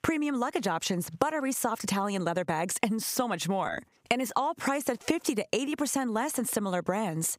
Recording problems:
squashed, flat; somewhat

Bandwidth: 15.5 kHz